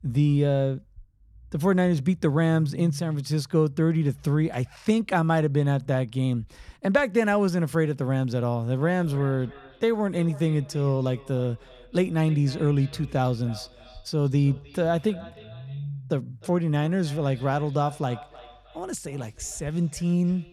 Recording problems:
echo of what is said; faint; from 9 s on; 310 ms later, 25 dB below the speech
low rumble; faint; throughout; 25 dB below the speech

